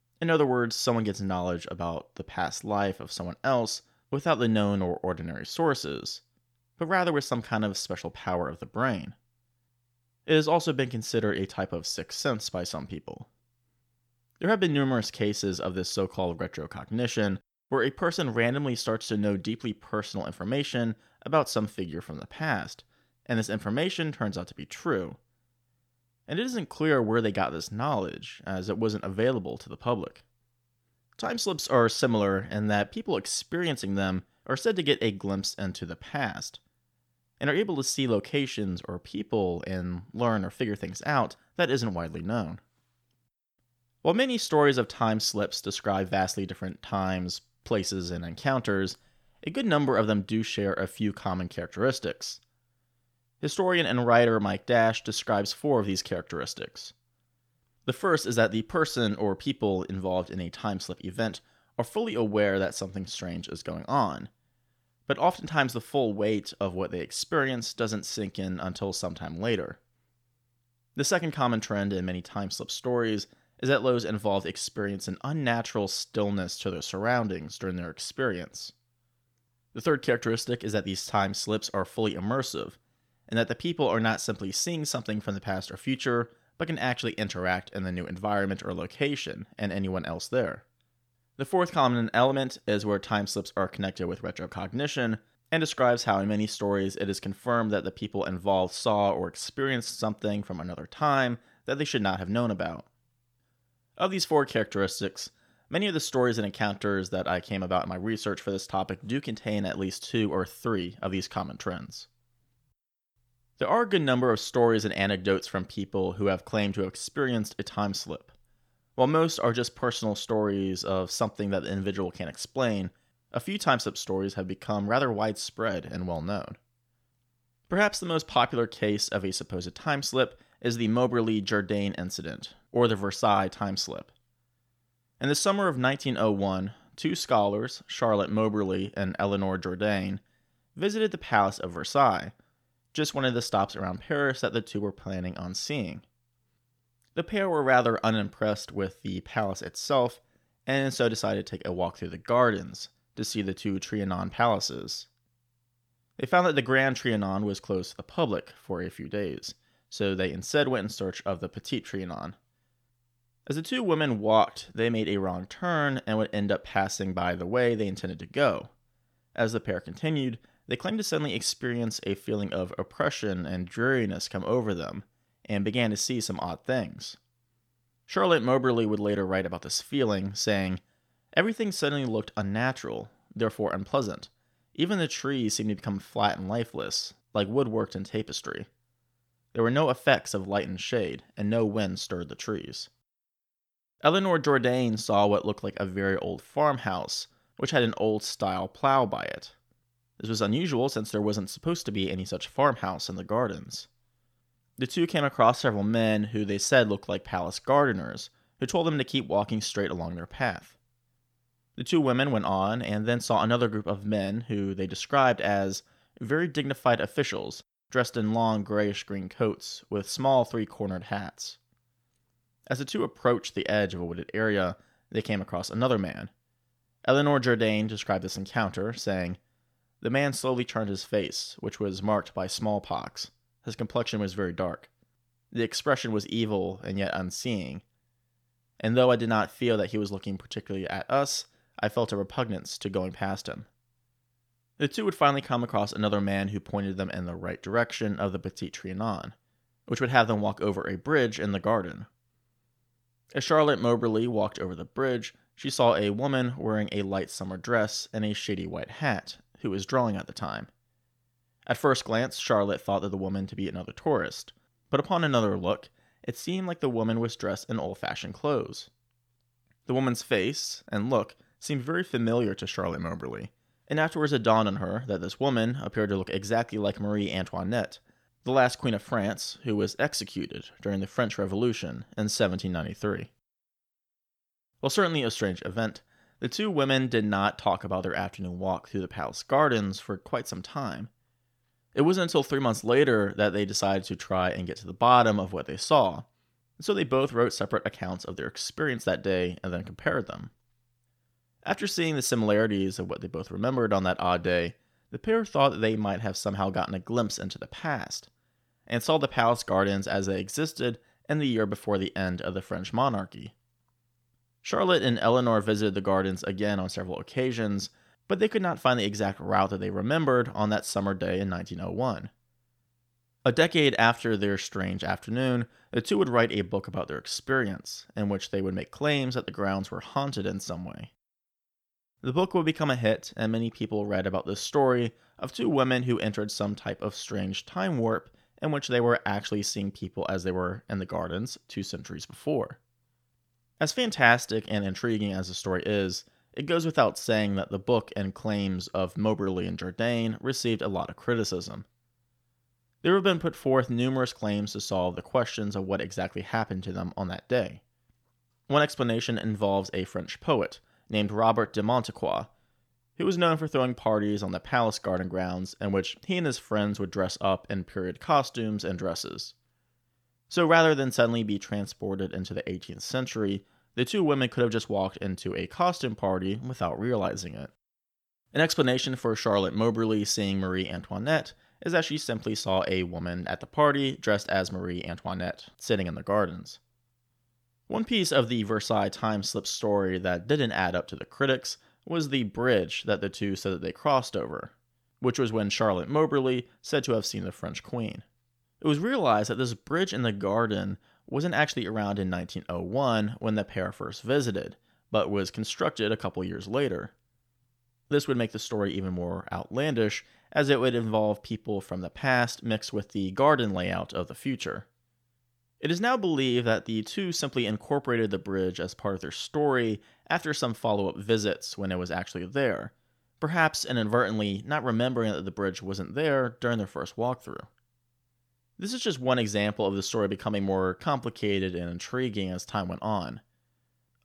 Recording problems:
none

